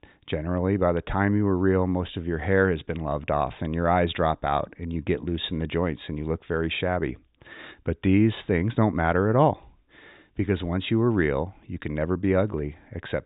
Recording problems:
high frequencies cut off; severe; nothing above 3.5 kHz

